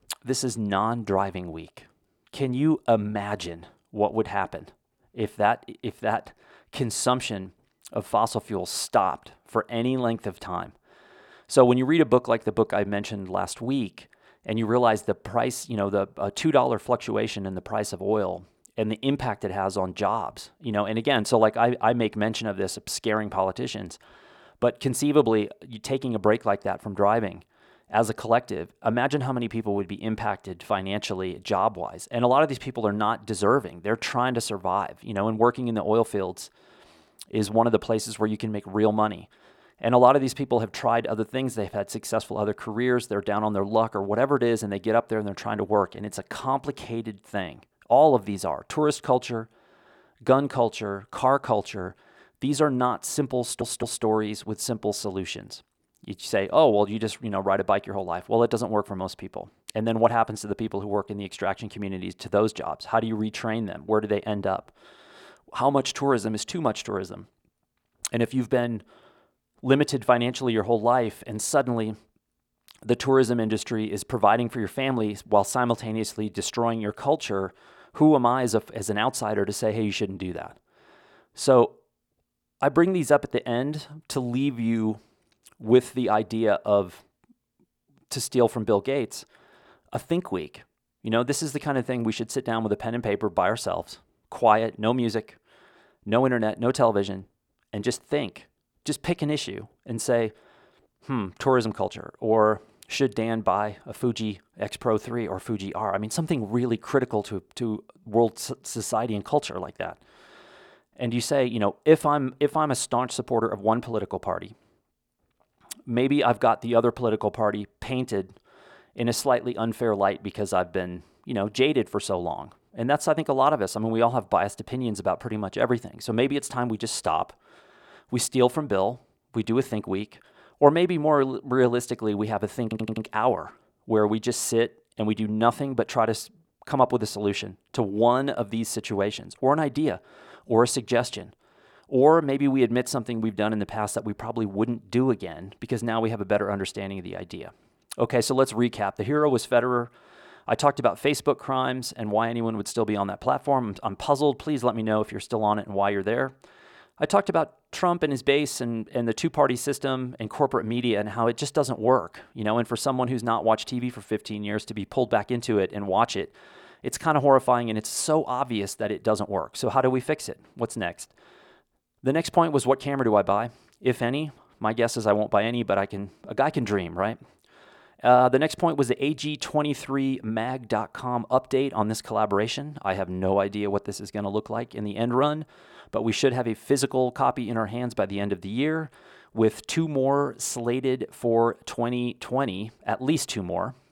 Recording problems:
audio stuttering; at 53 s and at 2:13

